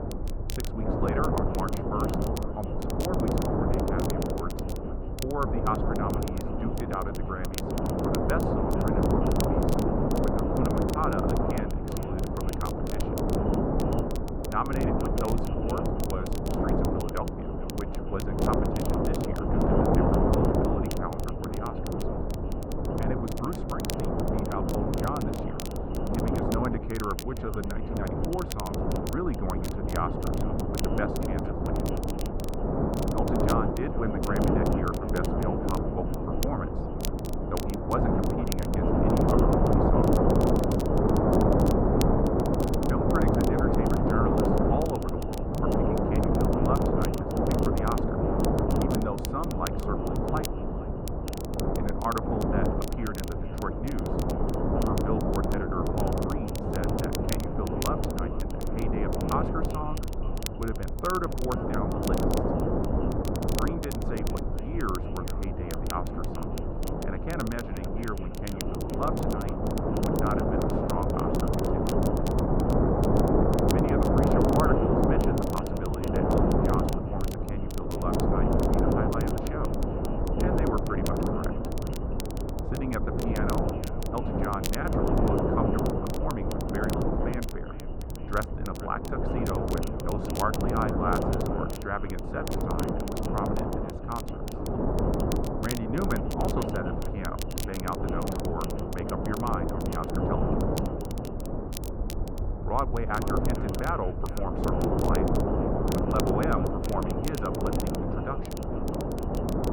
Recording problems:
muffled; very; fading above 3.5 kHz
echo of what is said; faint; throughout; 460 ms later, 20 dB below the speech
wind noise on the microphone; heavy; 3 dB above the speech
crackle, like an old record; loud; 9 dB below the speech
low rumble; faint; throughout; 20 dB below the speech

